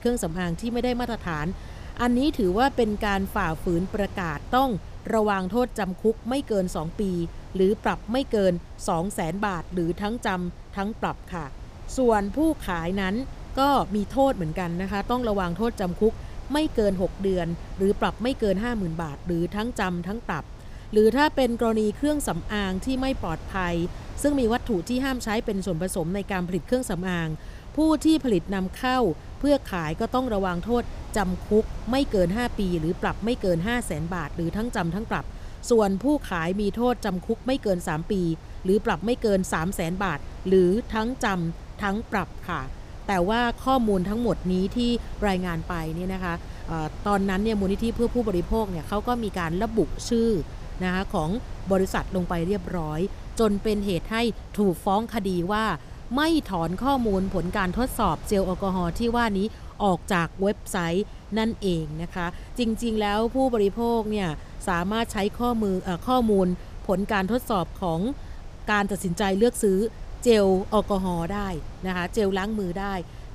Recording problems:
wind noise on the microphone; occasional gusts; 20 dB below the speech

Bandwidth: 15 kHz